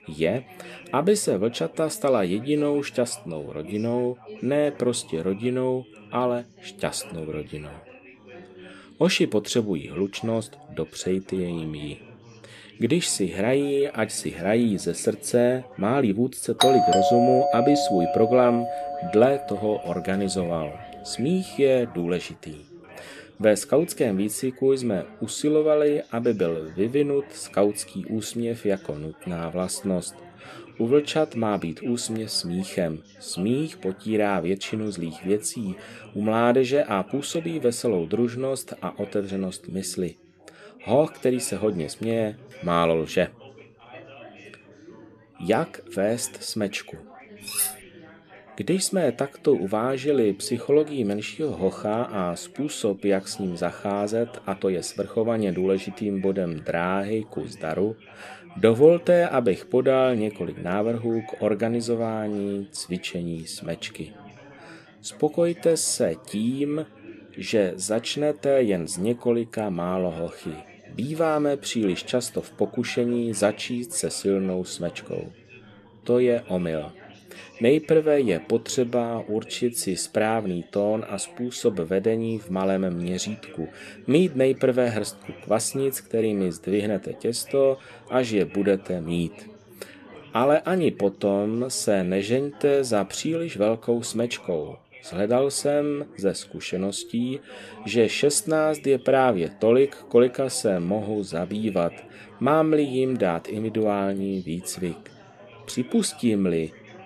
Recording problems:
background chatter; faint; throughout; 4 voices, 20 dB below the speech
doorbell; loud; from 17 to 19 s; peak 5 dB above the speech
clattering dishes; noticeable; at 47 s; peak level with the speech

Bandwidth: 13.5 kHz